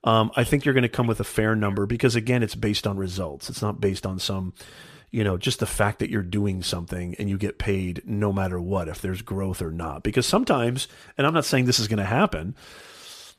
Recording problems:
none

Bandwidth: 14.5 kHz